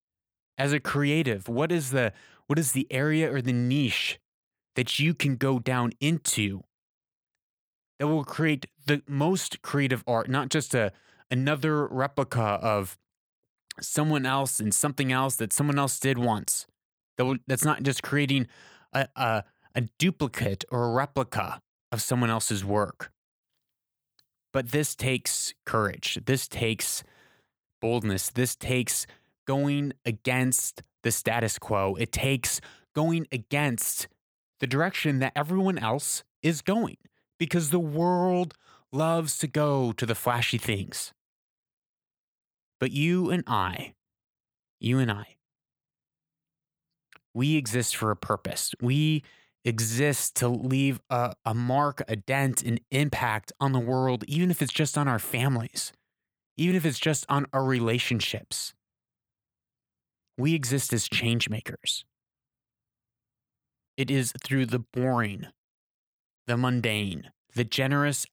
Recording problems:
none

